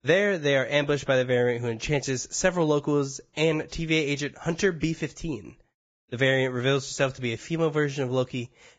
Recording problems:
garbled, watery; badly; nothing above 7.5 kHz

